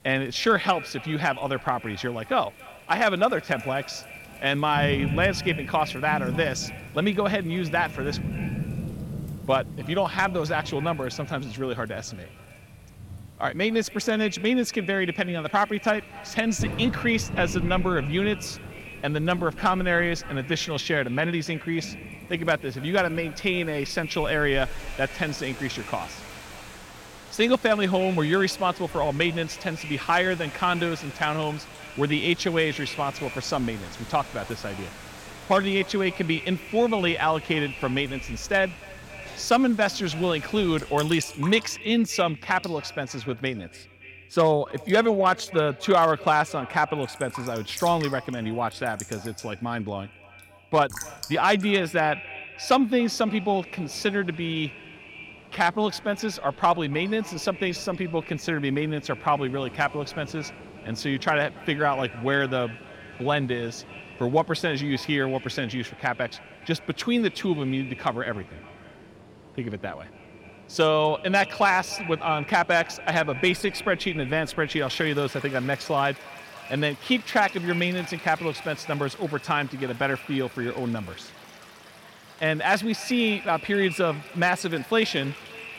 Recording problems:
echo of what is said; noticeable; throughout; 280 ms later, 15 dB below the speech
rain or running water; noticeable; throughout; 15 dB below the speech

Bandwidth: 16.5 kHz